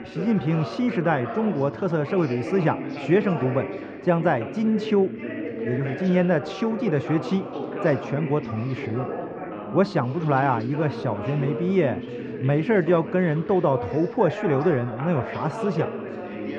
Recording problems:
muffled; very; fading above 2 kHz
background chatter; loud; throughout; 3 voices, 8 dB below the speech

